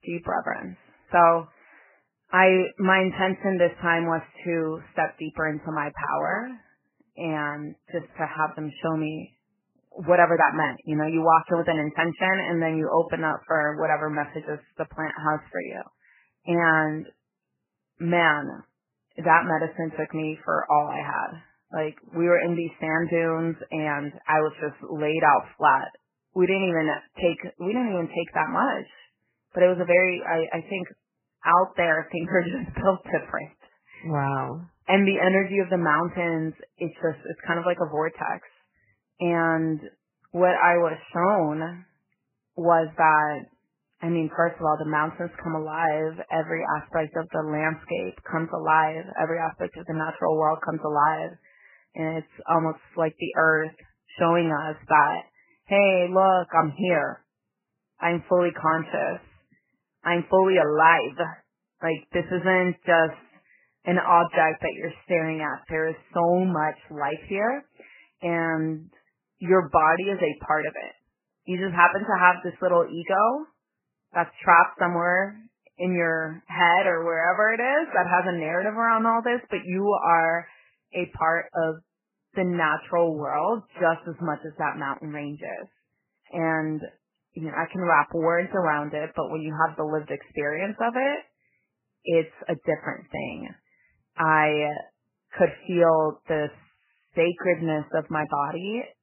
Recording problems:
garbled, watery; badly; nothing above 3 kHz

